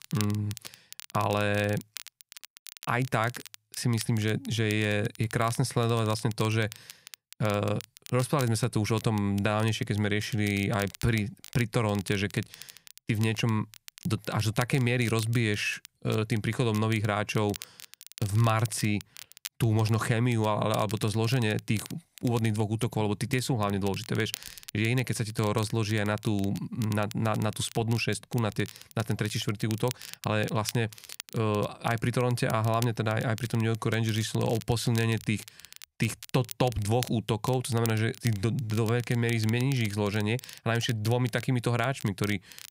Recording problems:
crackle, like an old record; noticeable; 15 dB below the speech

